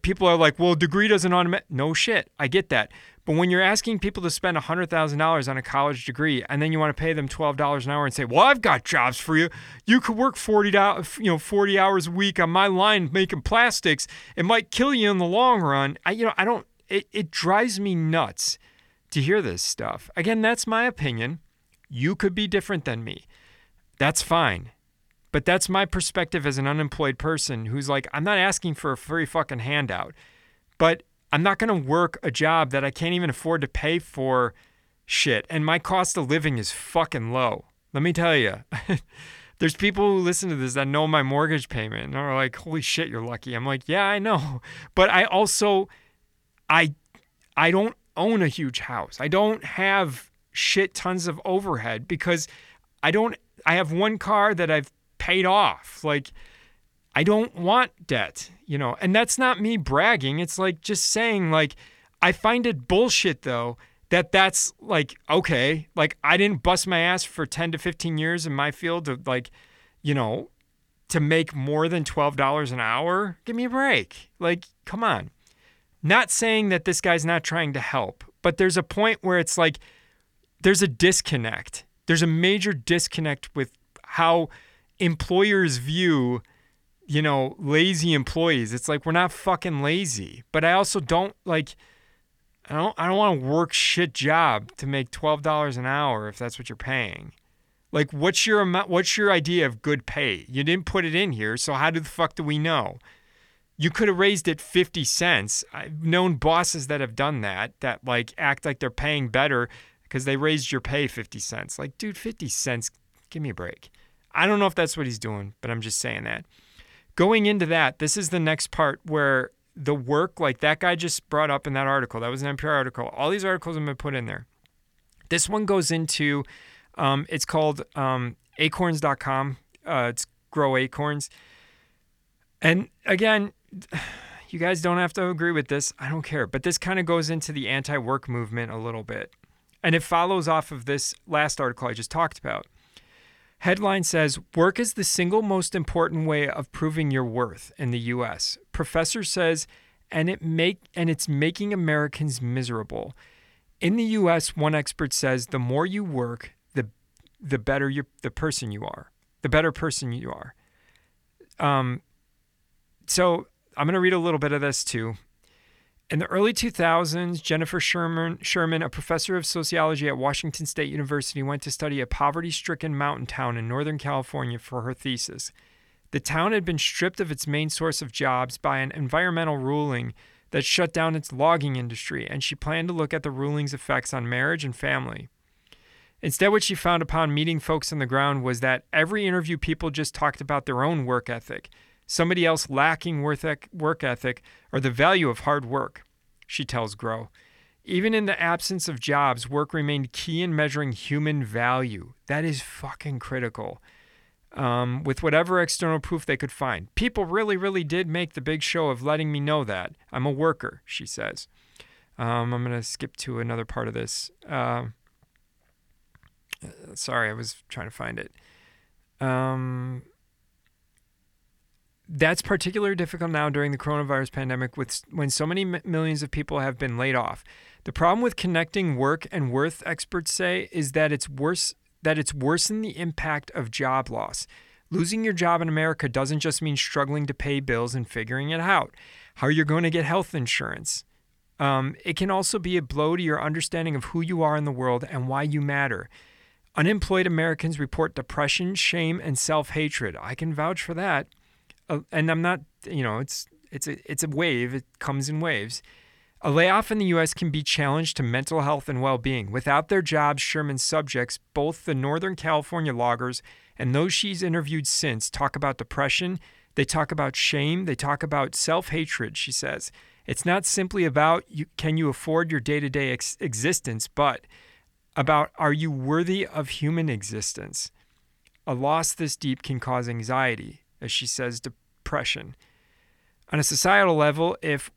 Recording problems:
none

